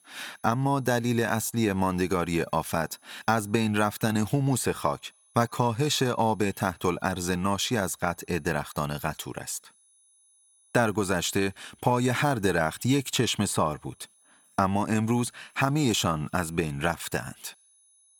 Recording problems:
high-pitched whine; faint; throughout; 10 kHz, 30 dB below the speech

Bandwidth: 18 kHz